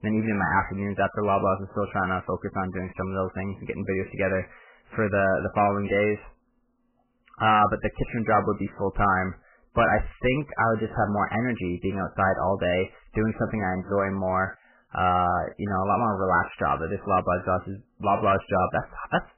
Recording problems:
garbled, watery; badly; nothing above 3 kHz
distortion; slight; 10 dB below the speech

